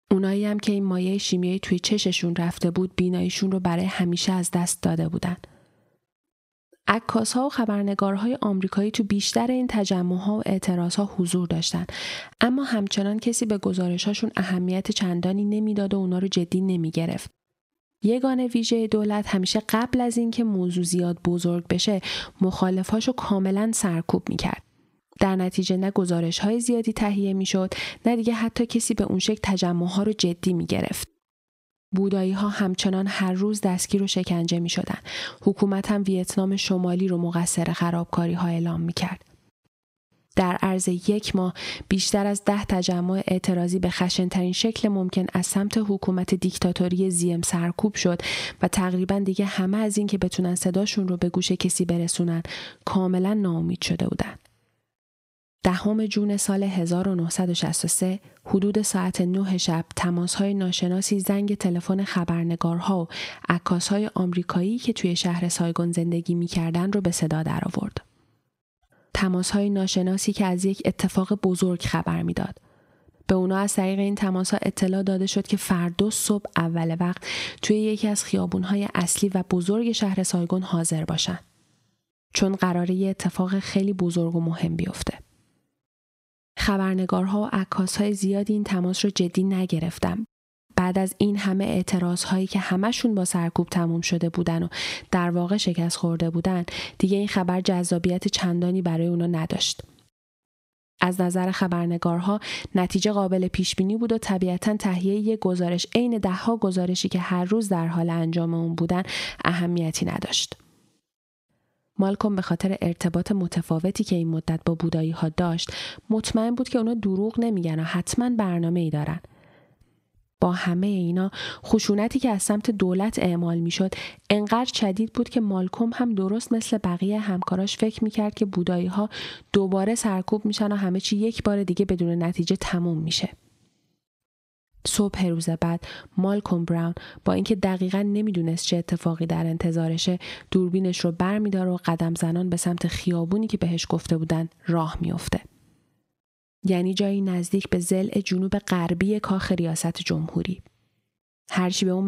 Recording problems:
squashed, flat; somewhat
abrupt cut into speech; at the end

